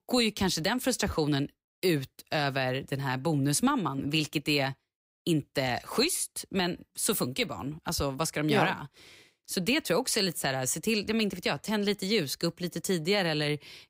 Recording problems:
none

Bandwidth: 15.5 kHz